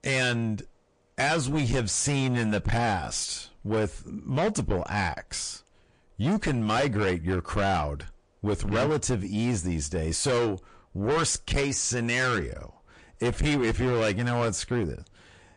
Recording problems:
distortion; heavy; 6 dB below the speech
garbled, watery; slightly; nothing above 9 kHz

